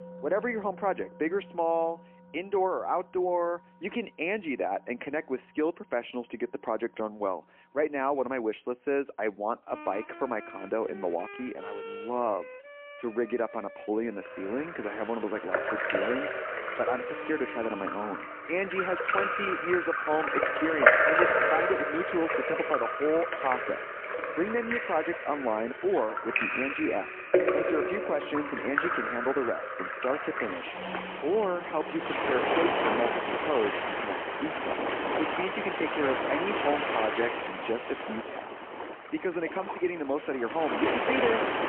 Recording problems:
phone-call audio; poor line
rain or running water; very loud; from 14 s on; 2 dB above the speech
background music; noticeable; throughout; 15 dB below the speech

